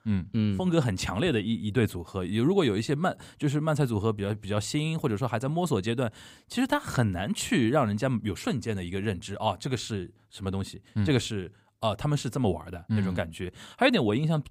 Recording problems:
none

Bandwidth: 15.5 kHz